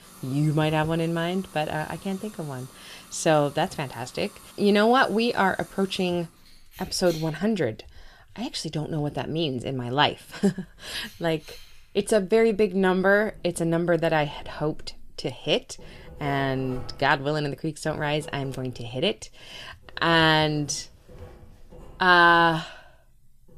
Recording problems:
household noises; faint; throughout; 25 dB below the speech

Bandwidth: 14.5 kHz